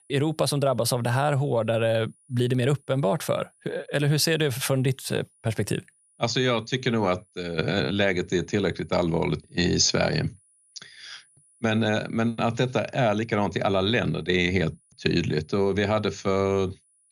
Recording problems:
high-pitched whine; faint; throughout; 10 kHz, 35 dB below the speech

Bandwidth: 14.5 kHz